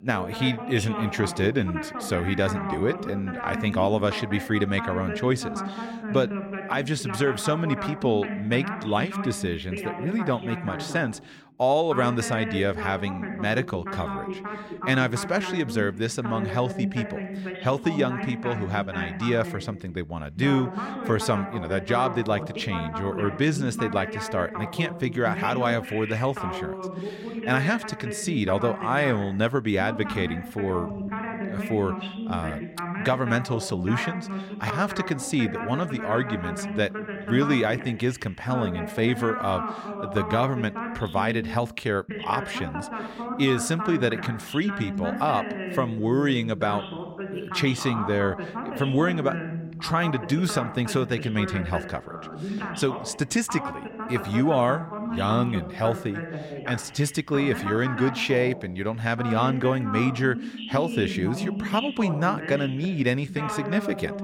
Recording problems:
voice in the background; loud; throughout; 7 dB below the speech

